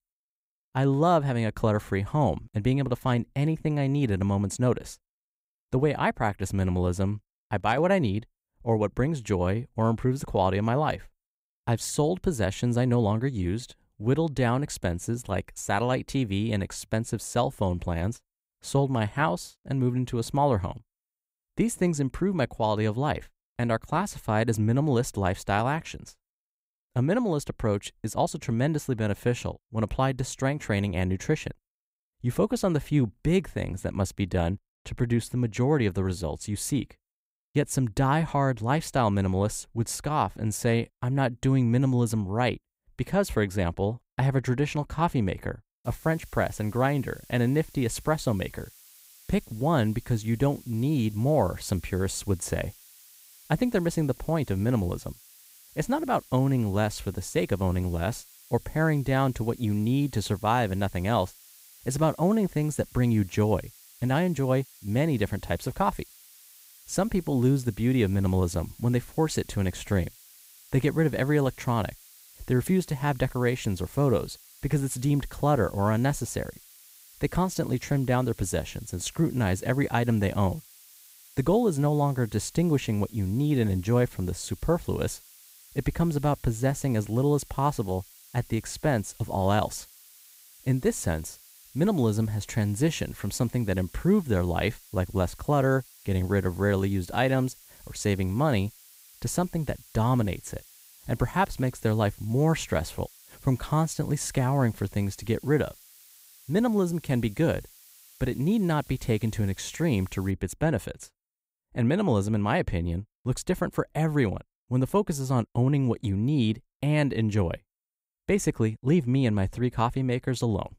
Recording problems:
hiss; faint; from 46 s to 1:50; 25 dB below the speech

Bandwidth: 15.5 kHz